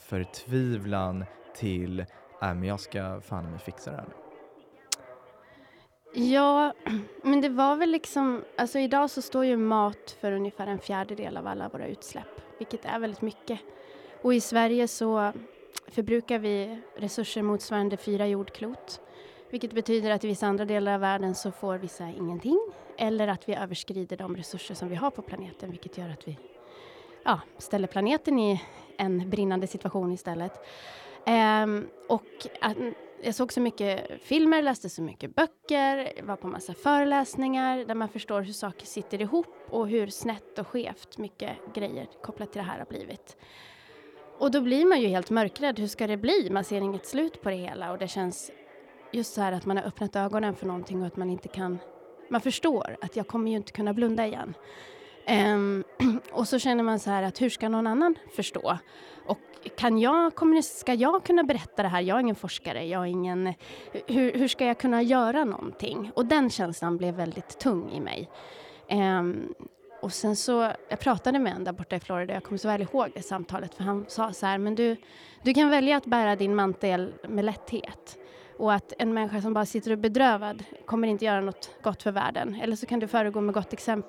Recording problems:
background chatter; faint; throughout; 2 voices, 25 dB below the speech

